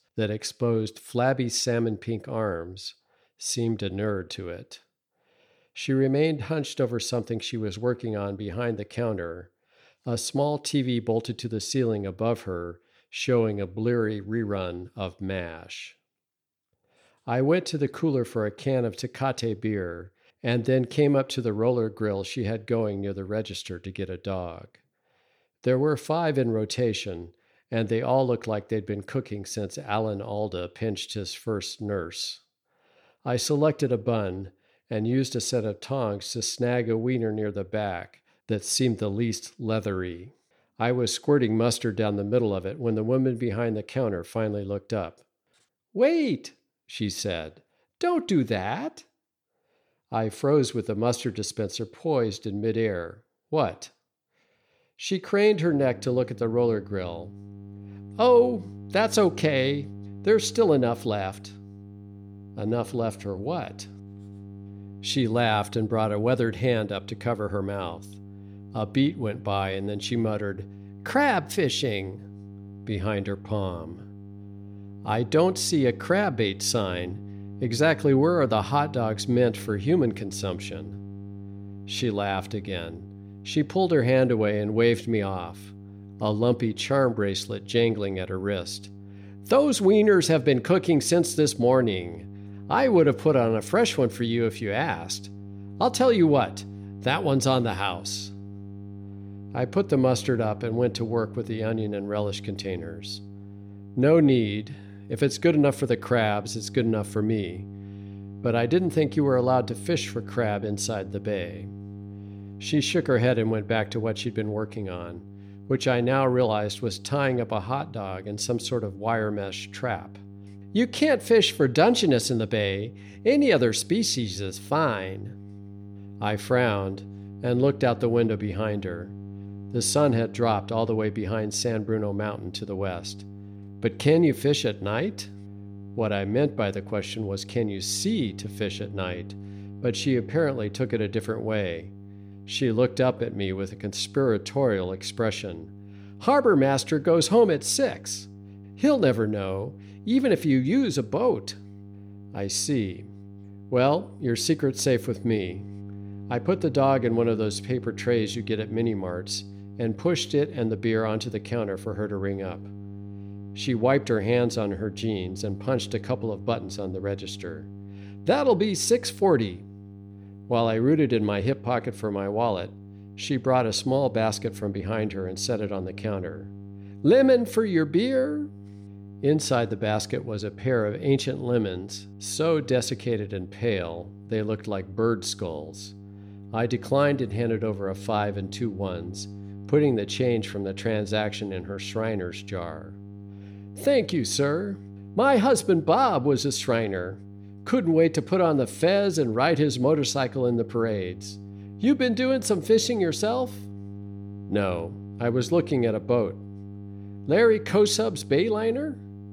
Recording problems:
electrical hum; faint; from 56 s on; 50 Hz, 25 dB below the speech

